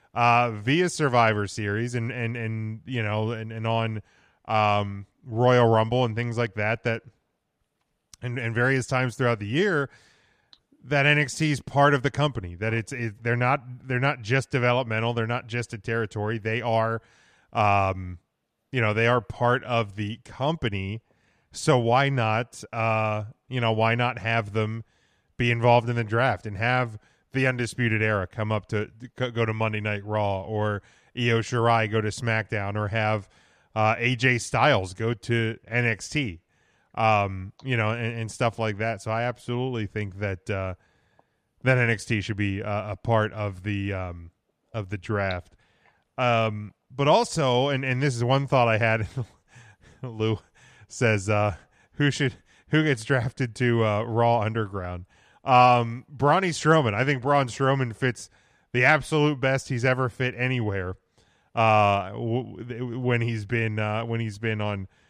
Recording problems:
none

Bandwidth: 14.5 kHz